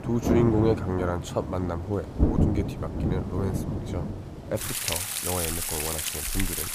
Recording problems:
rain or running water; very loud; throughout; 1 dB above the speech

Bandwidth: 15 kHz